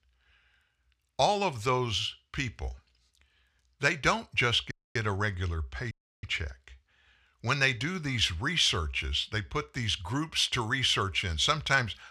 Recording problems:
audio cutting out; at 4.5 s and at 6 s

